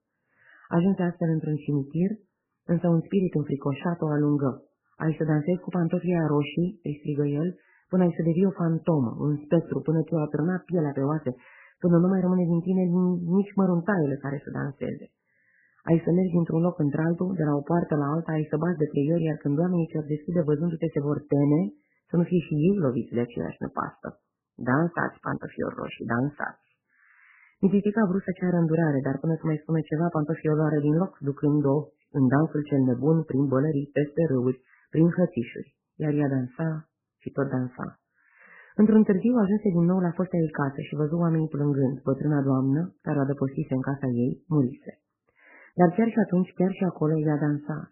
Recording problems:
garbled, watery; badly; nothing above 3 kHz
muffled; very slightly; fading above 2 kHz

